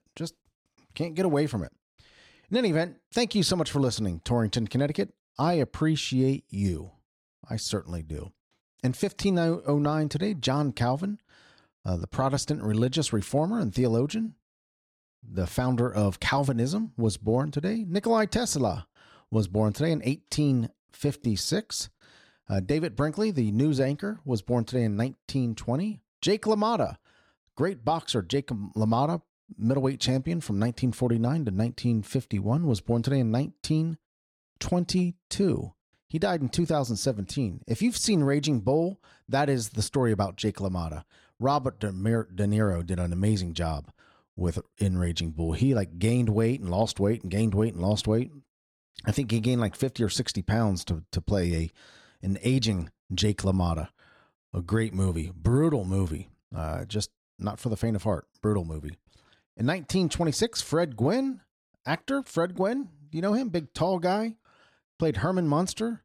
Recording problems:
none

